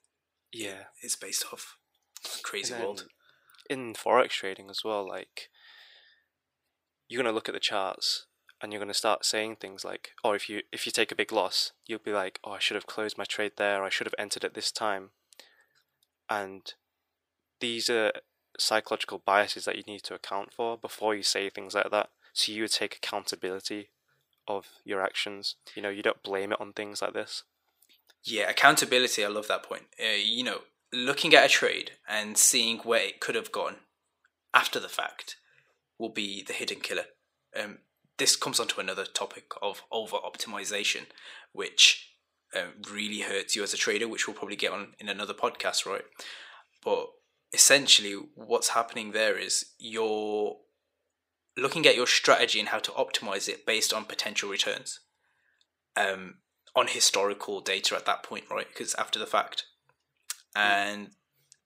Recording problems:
thin; somewhat; fading below 450 Hz

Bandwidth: 15.5 kHz